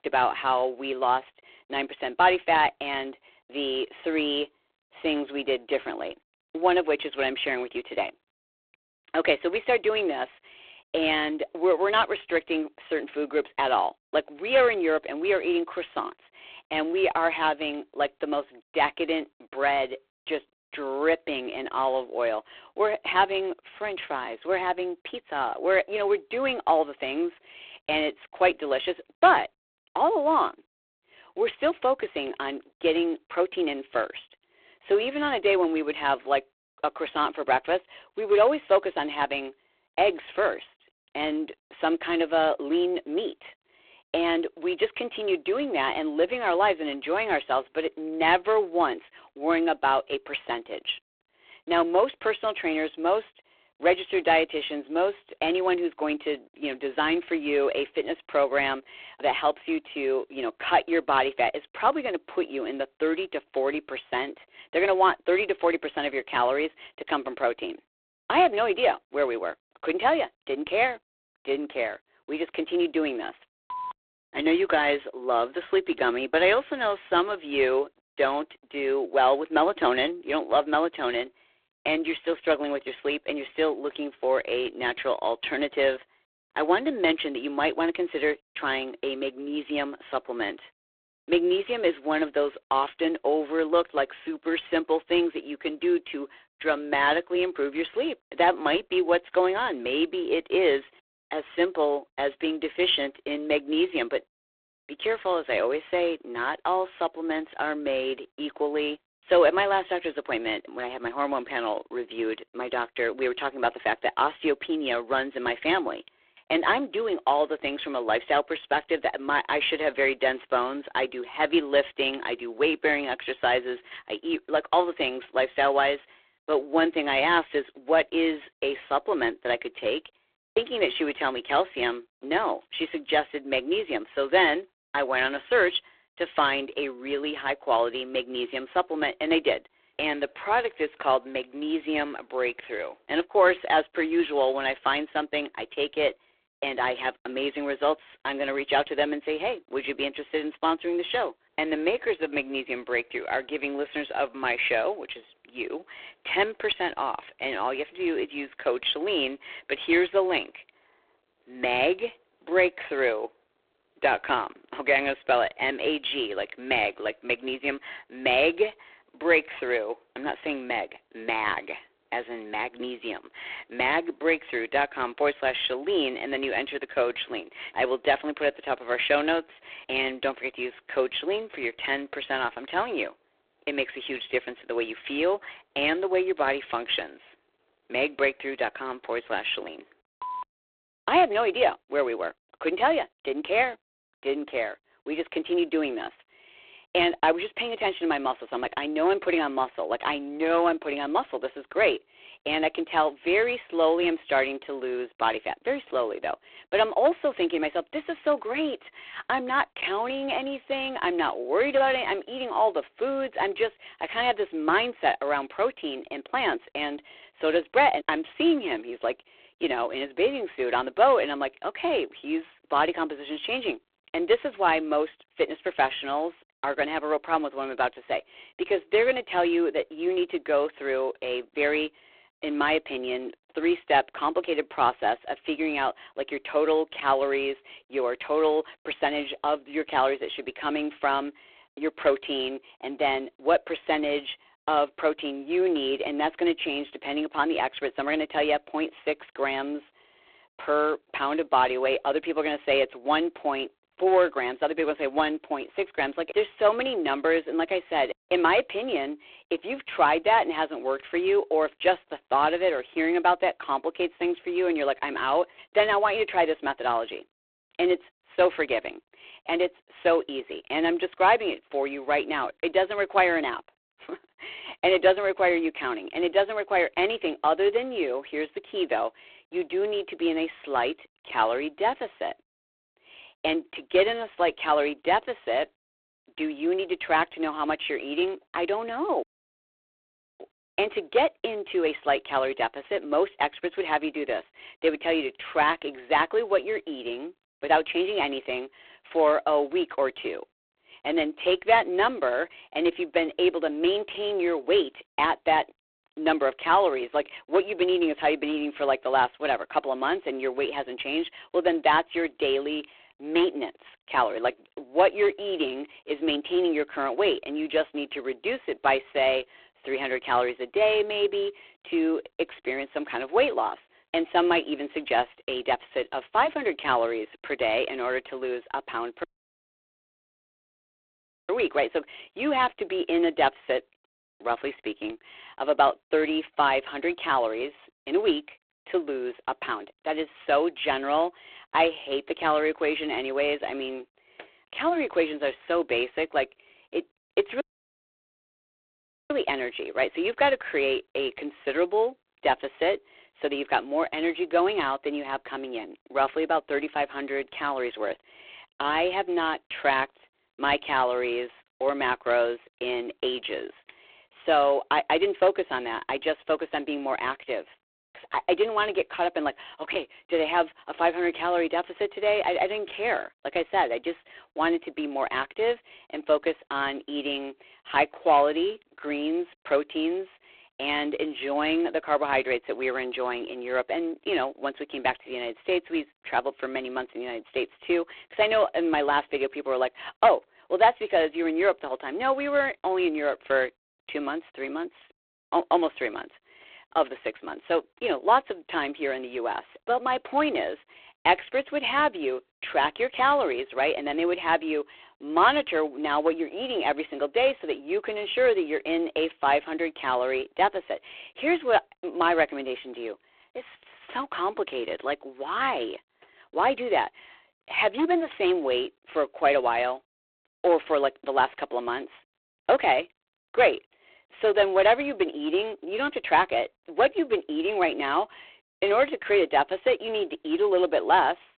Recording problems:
phone-call audio; poor line
audio cutting out; at 4:49 for 1 s, at 5:29 for 2.5 s and at 5:48 for 1.5 s

